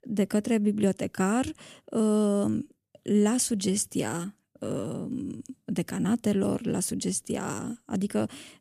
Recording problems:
none

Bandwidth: 14.5 kHz